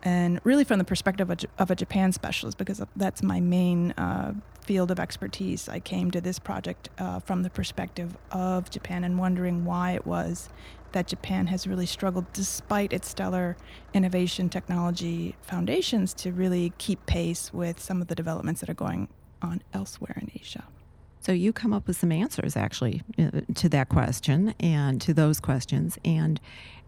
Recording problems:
traffic noise; faint; throughout; 25 dB below the speech

